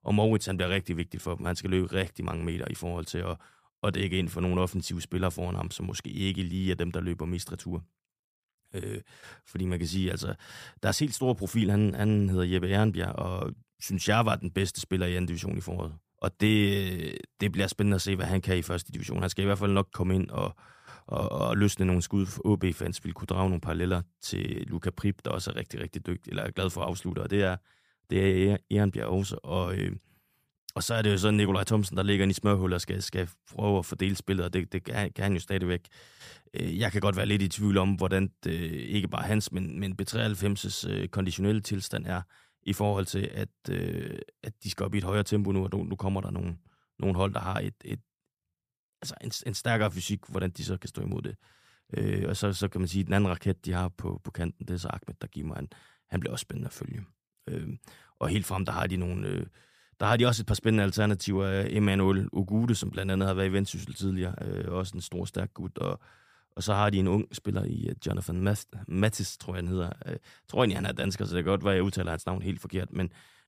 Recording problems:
none

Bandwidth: 15 kHz